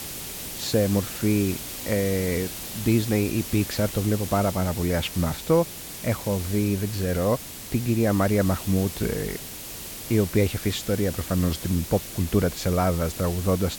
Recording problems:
hiss; loud; throughout; 9 dB below the speech

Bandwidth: 17 kHz